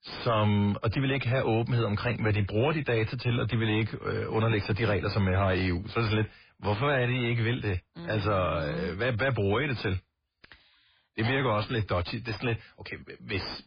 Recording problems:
garbled, watery; badly; nothing above 5 kHz
distortion; slight; 10 dB below the speech

